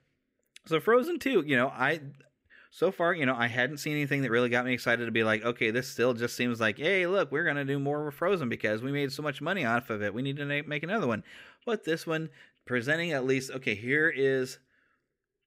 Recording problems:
none

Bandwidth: 15.5 kHz